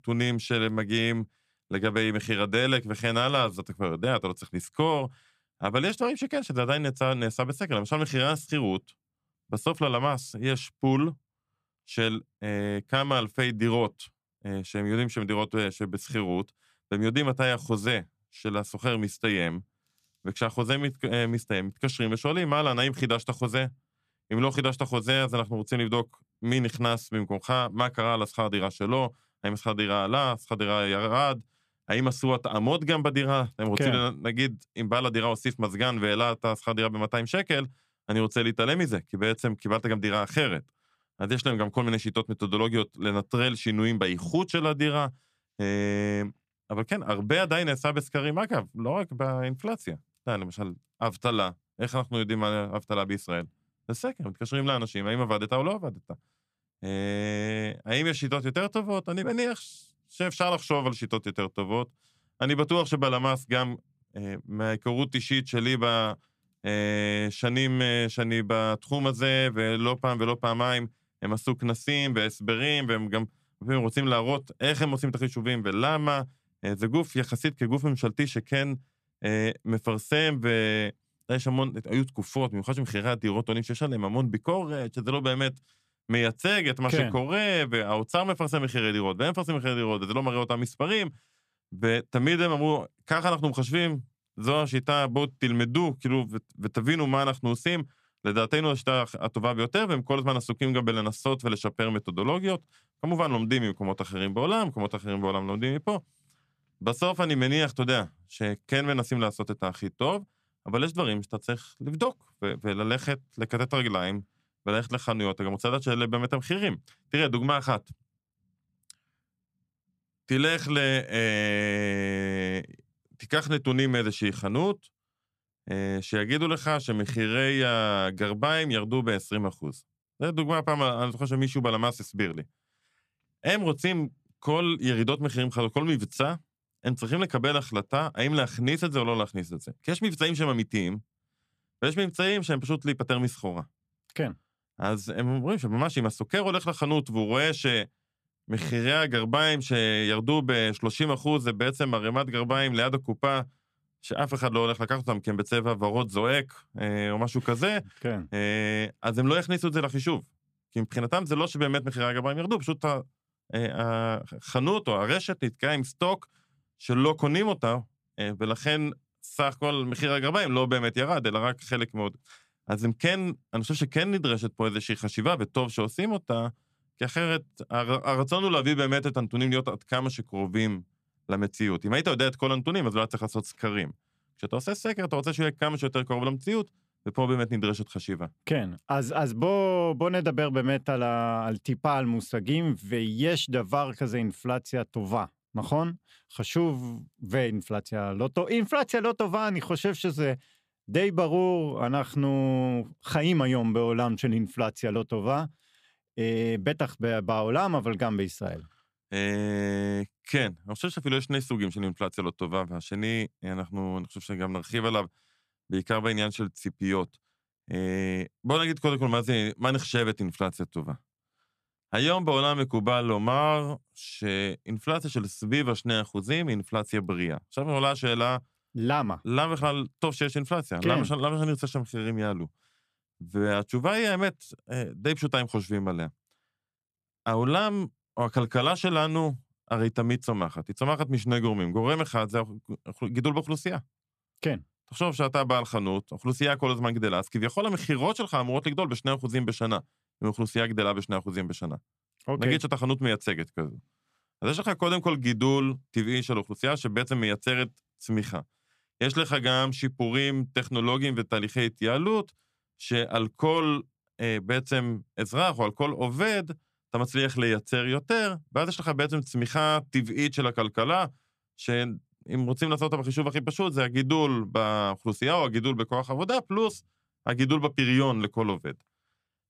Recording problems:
none

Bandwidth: 14.5 kHz